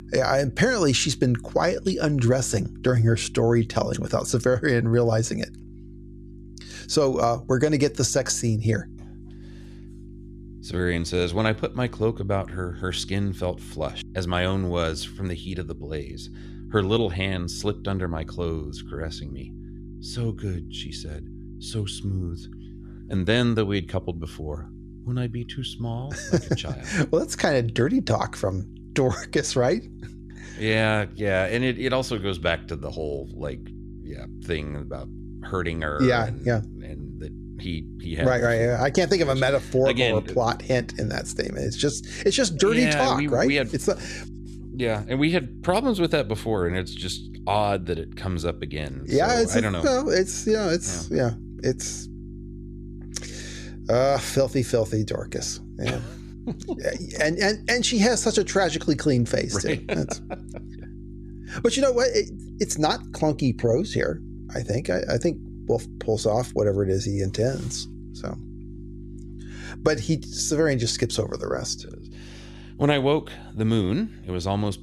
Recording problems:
electrical hum; faint; throughout; 50 Hz, 25 dB below the speech

